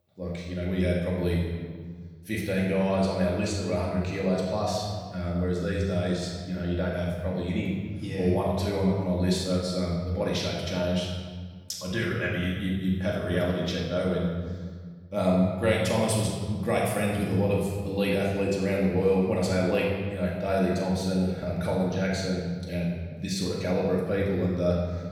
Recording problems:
off-mic speech; far
room echo; noticeable; dies away in 1.5 s

